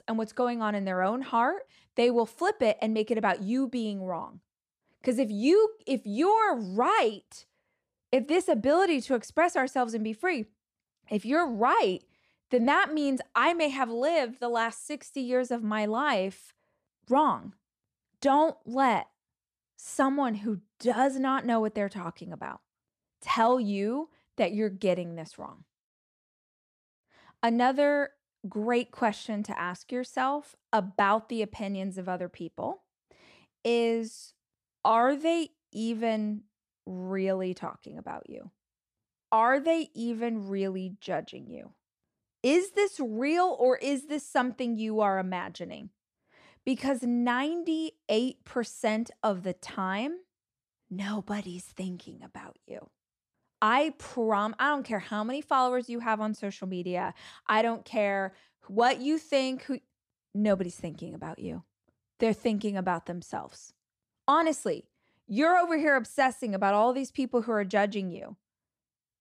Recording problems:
none

